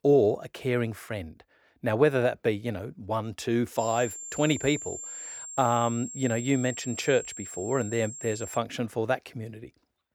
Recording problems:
high-pitched whine; loud; from 4 to 8.5 s; 7.5 kHz, 10 dB below the speech

